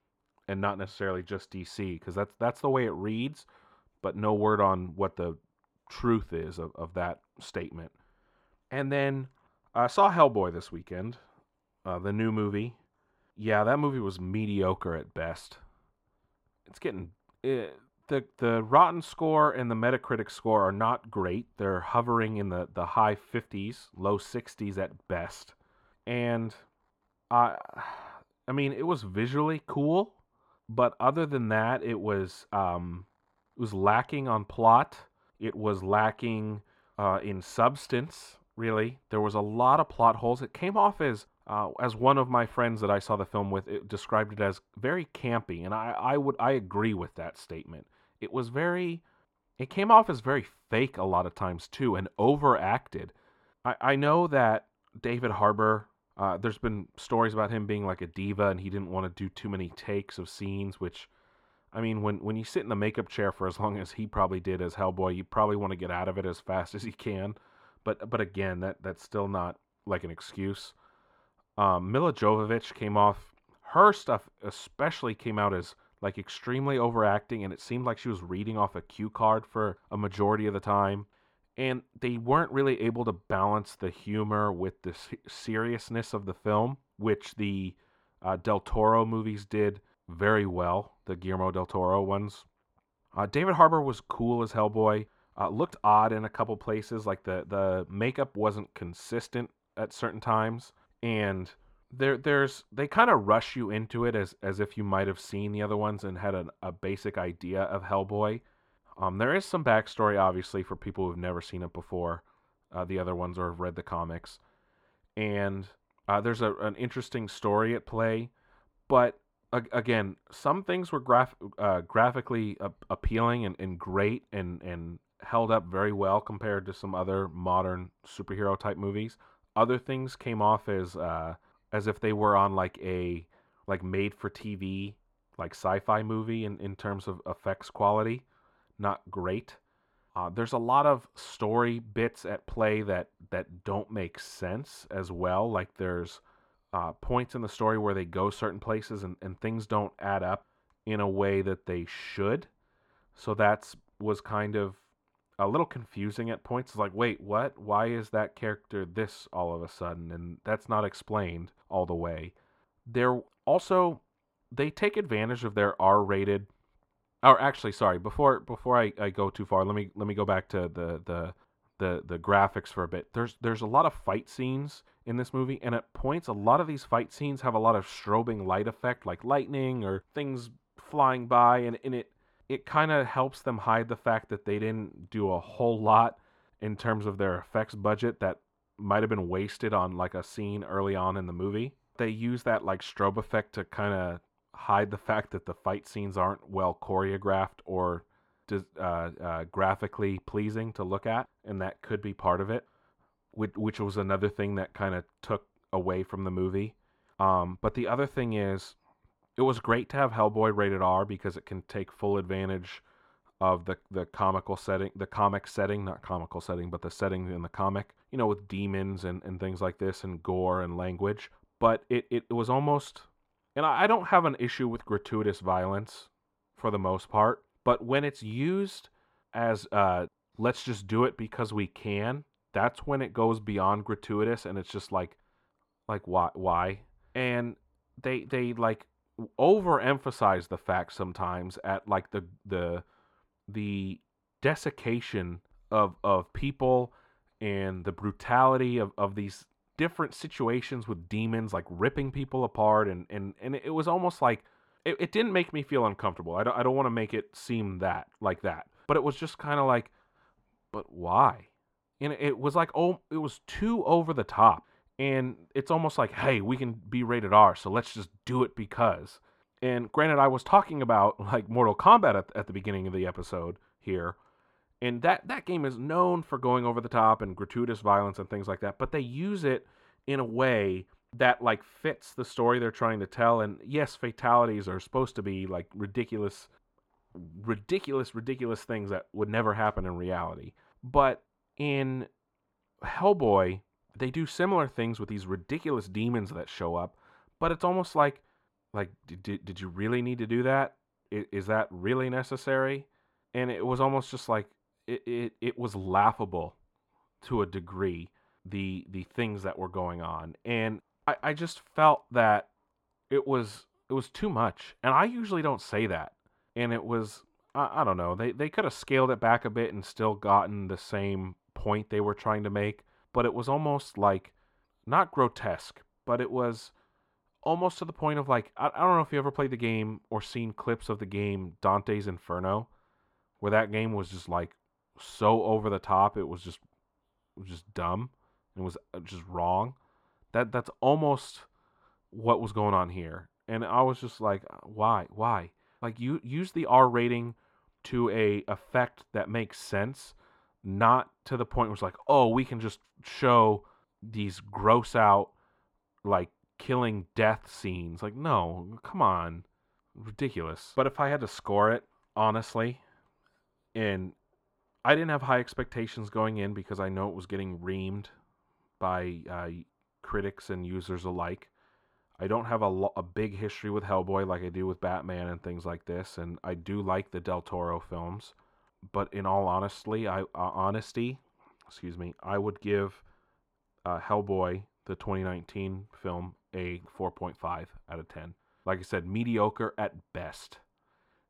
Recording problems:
muffled; slightly; fading above 2.5 kHz

